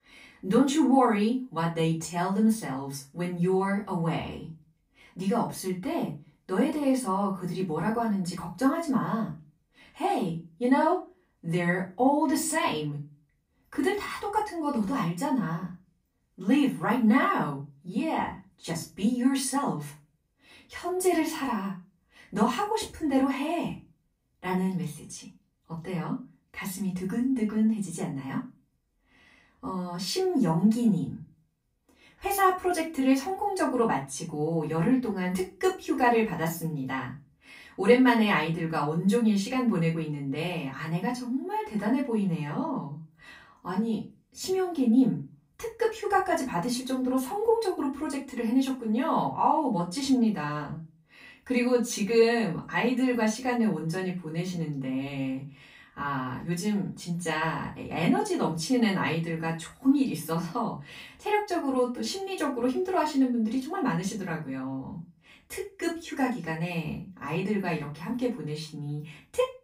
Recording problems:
off-mic speech; far
room echo; slight; dies away in 0.3 s

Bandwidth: 15.5 kHz